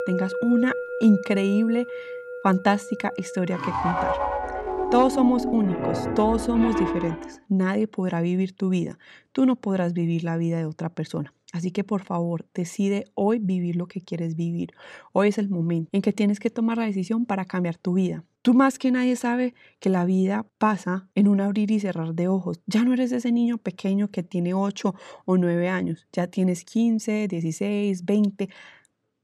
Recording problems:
background music; loud; until 7 s; 5 dB below the speech

